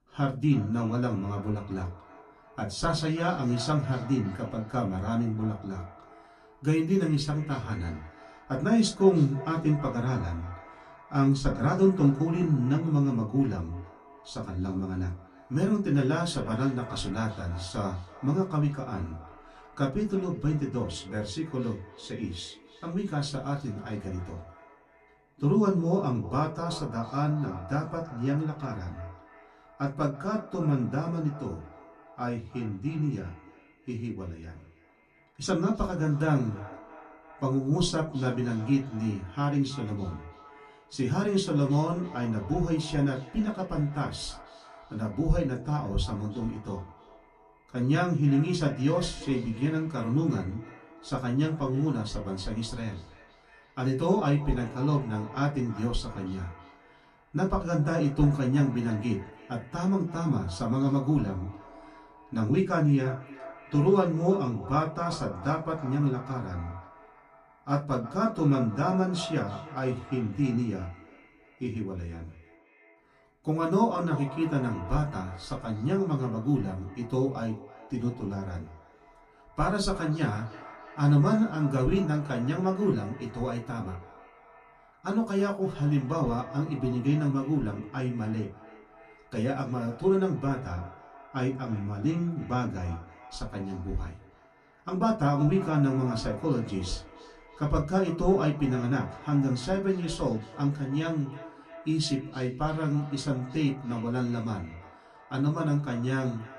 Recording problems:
off-mic speech; far
echo of what is said; noticeable; throughout; 320 ms later, 20 dB below the speech
room echo; very slight; dies away in 0.2 s

